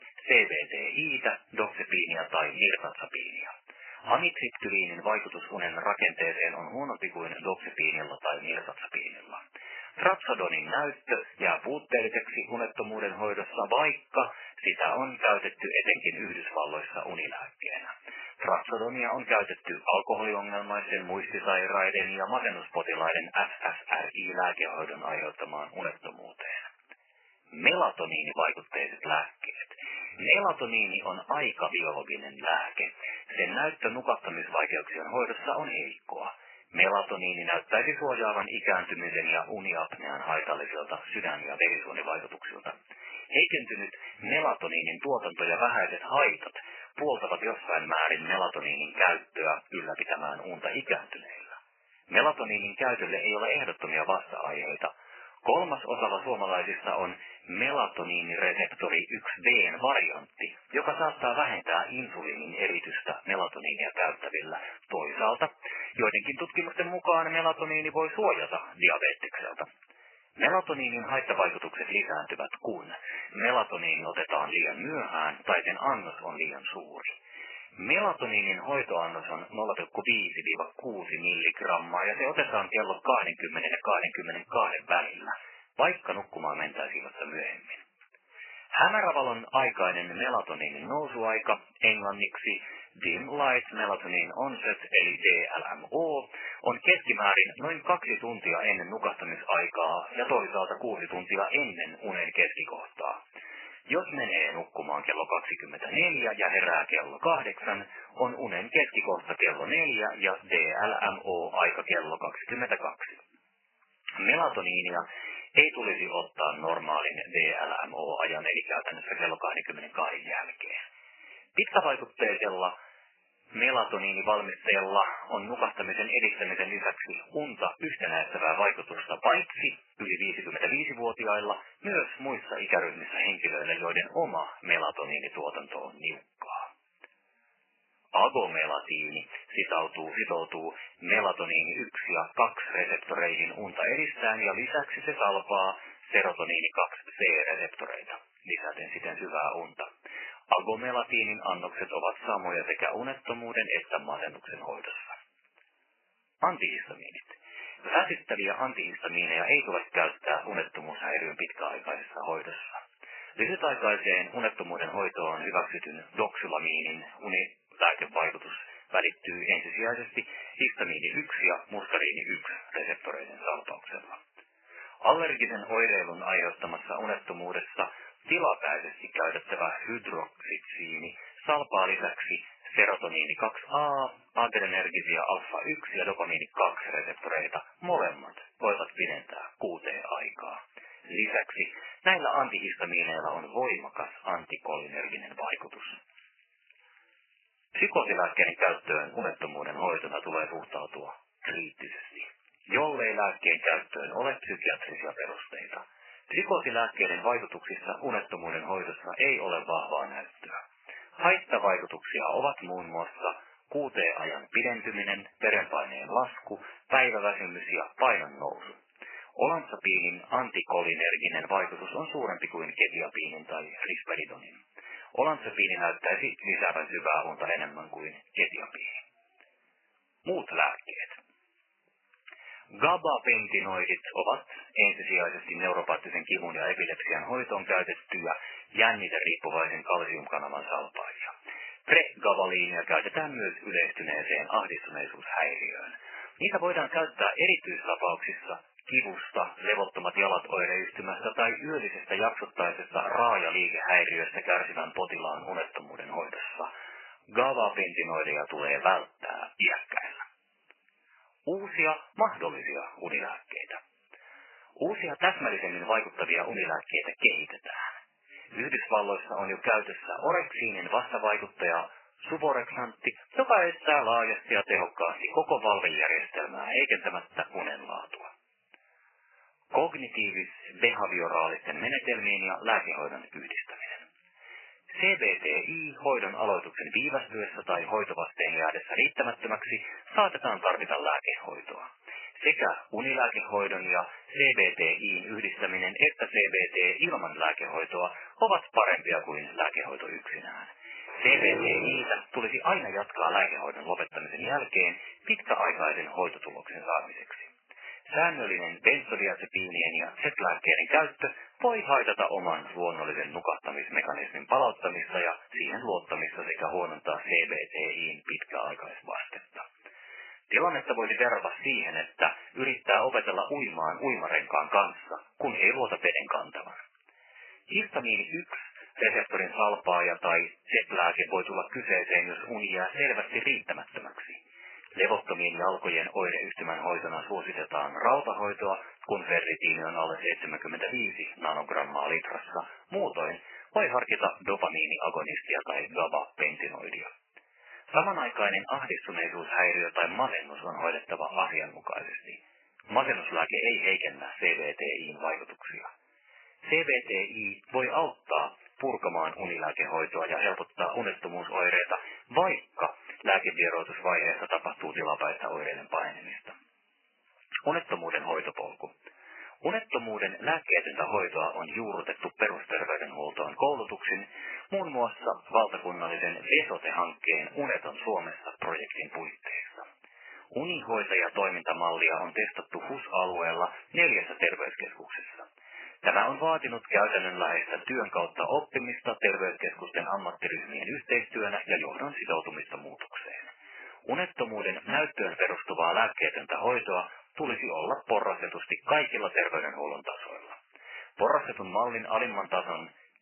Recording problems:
garbled, watery; badly; nothing above 3 kHz
thin; very; fading below 650 Hz
jangling keys; very faint; from 3:16 to 3:18; peak 30 dB below the speech
dog barking; noticeable; from 5:01 to 5:02; peak 2 dB below the speech

